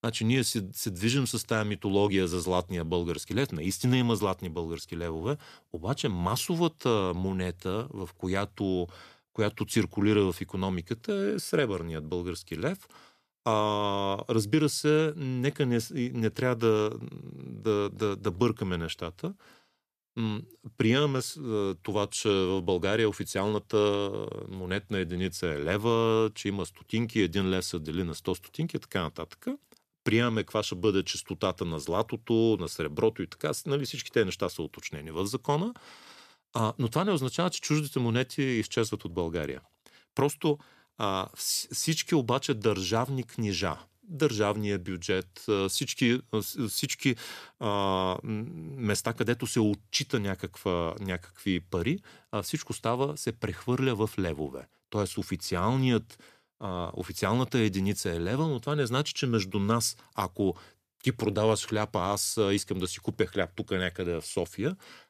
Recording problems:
none

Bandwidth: 14.5 kHz